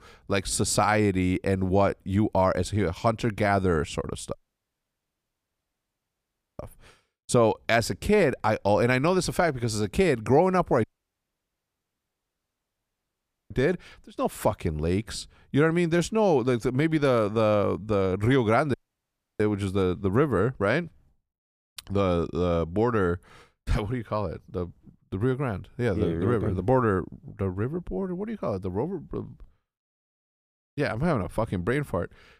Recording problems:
audio cutting out; at 4.5 s for 2 s, at 11 s for 2.5 s and at 19 s for 0.5 s

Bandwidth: 15 kHz